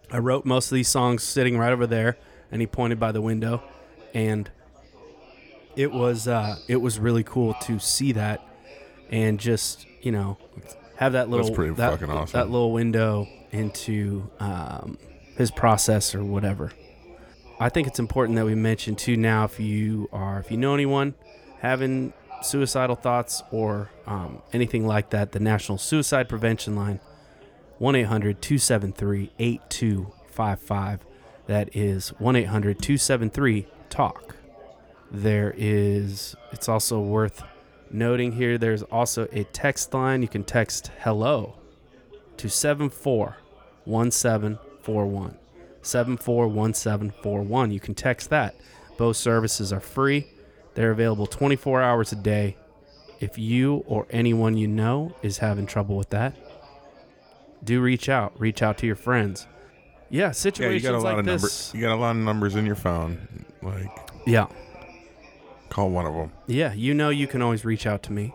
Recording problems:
chatter from many people; faint; throughout; 25 dB below the speech

